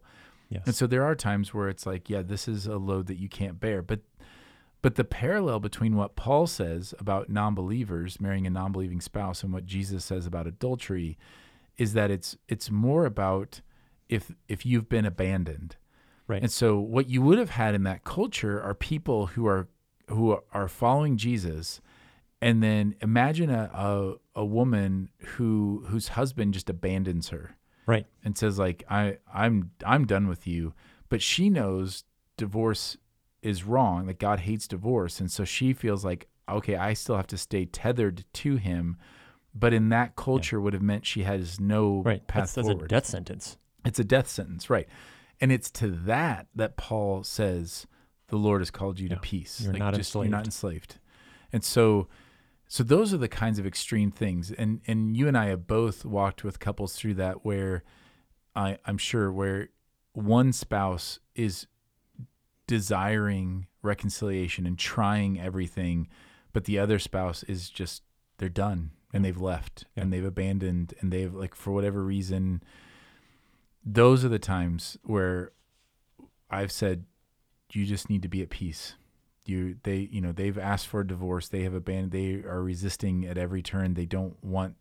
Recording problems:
none

